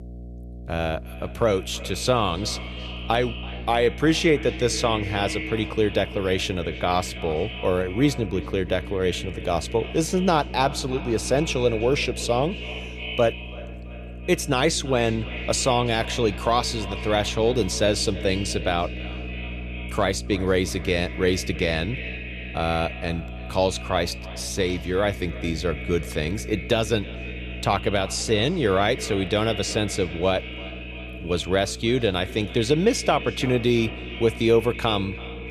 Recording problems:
echo of what is said; noticeable; throughout; 330 ms later, 10 dB below the speech
electrical hum; faint; throughout; 60 Hz, 25 dB below the speech

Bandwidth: 13.5 kHz